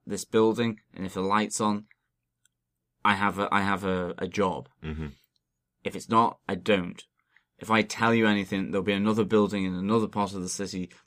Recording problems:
none

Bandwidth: 15 kHz